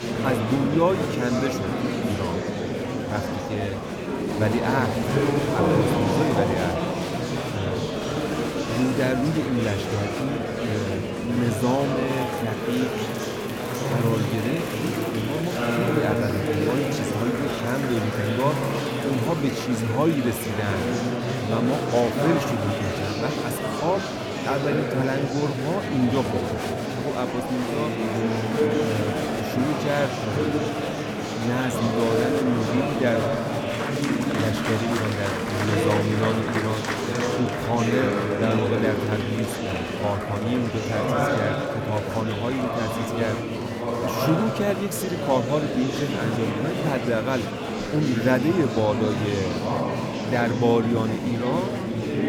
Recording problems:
murmuring crowd; very loud; throughout; 1 dB above the speech

